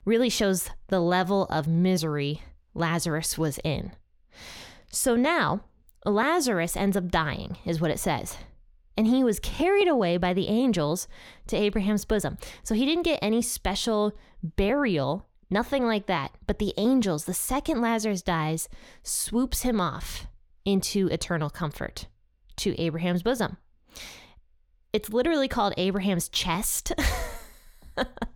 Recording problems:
none

